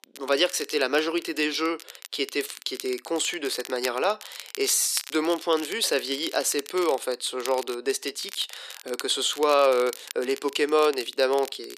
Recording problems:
thin; somewhat; fading below 350 Hz
crackle, like an old record; noticeable; 15 dB below the speech

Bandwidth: 14.5 kHz